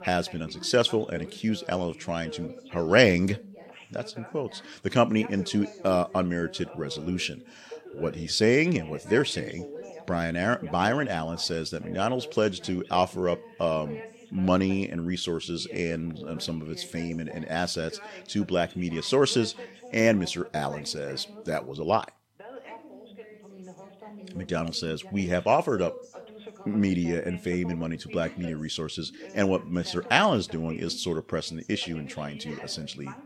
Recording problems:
background chatter; noticeable; throughout; 2 voices, 15 dB below the speech

